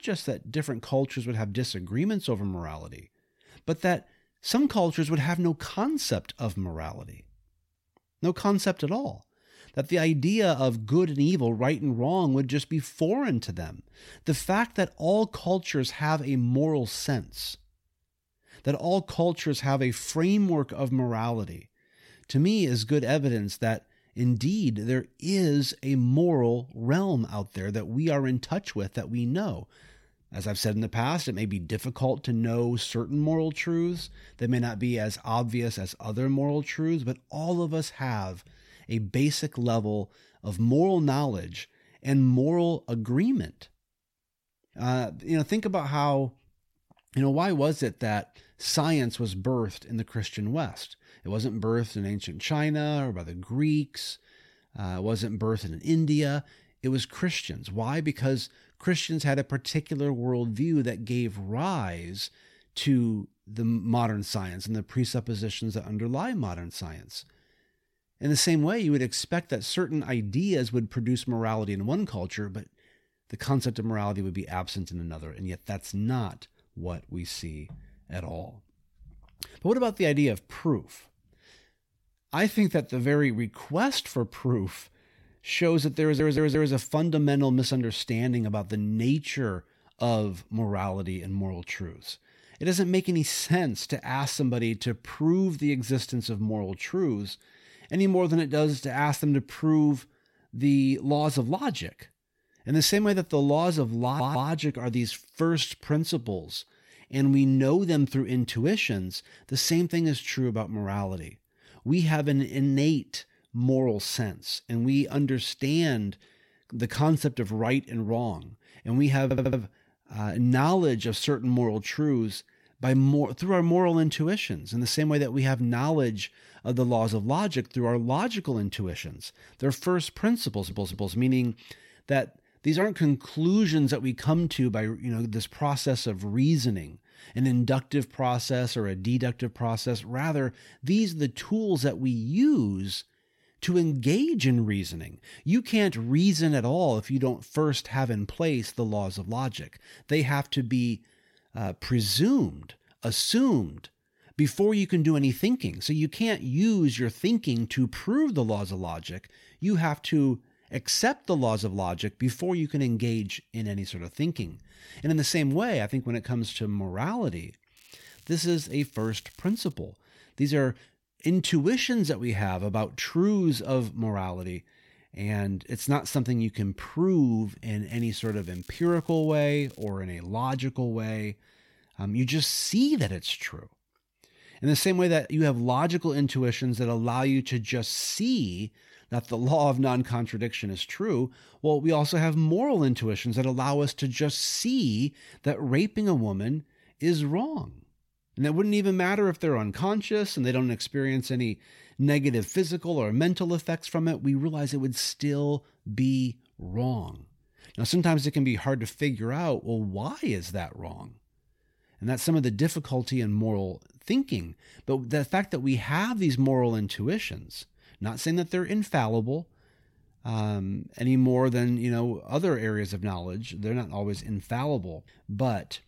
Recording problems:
crackling; faint; from 2:48 to 2:50 and from 2:58 to 3:00; 25 dB below the speech
audio stuttering; 4 times, first at 1:26

